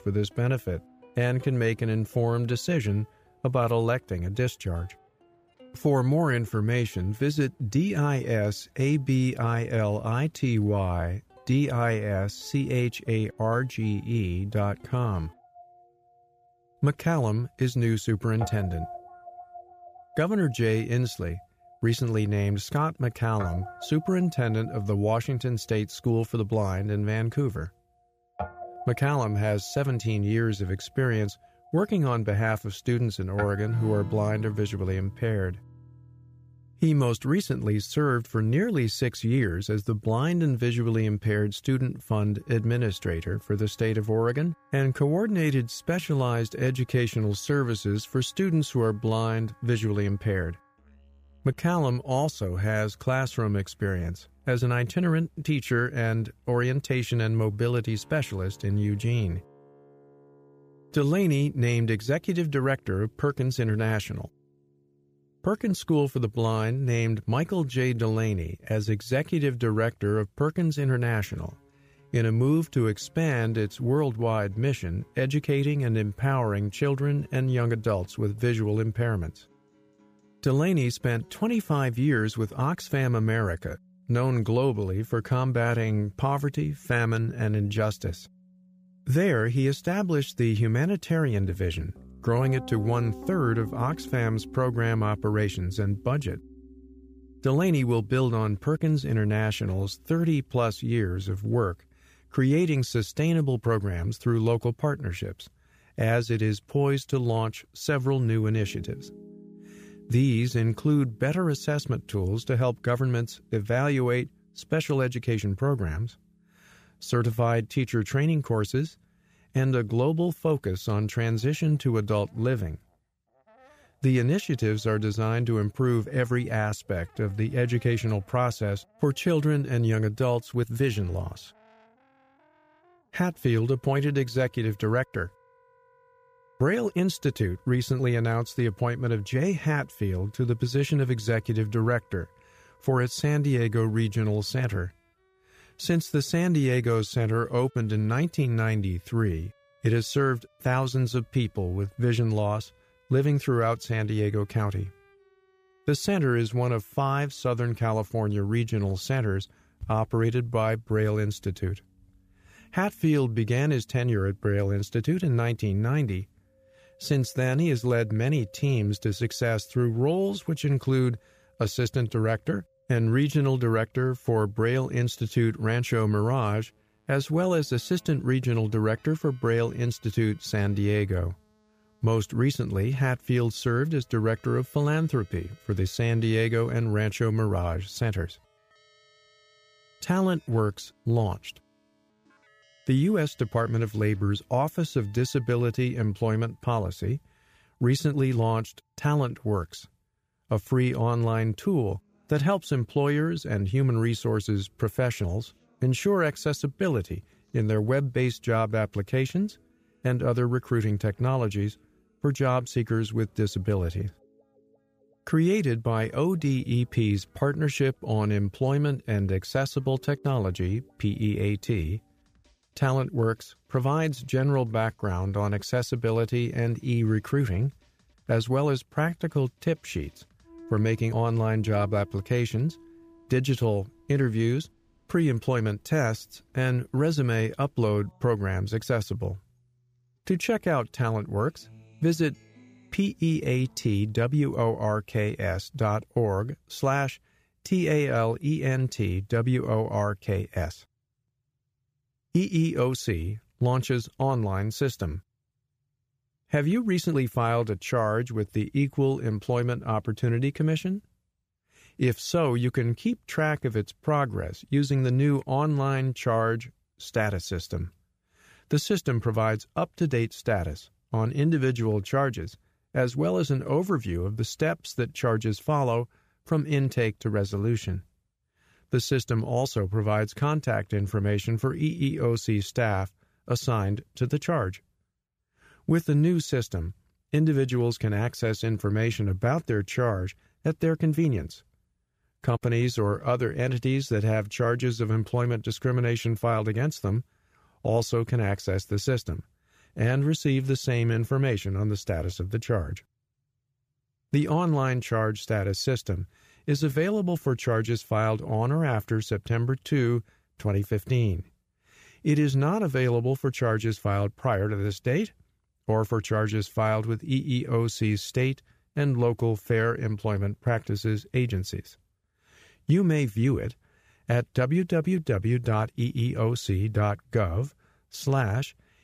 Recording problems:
background music; faint; until 4:04; 25 dB below the speech

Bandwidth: 15 kHz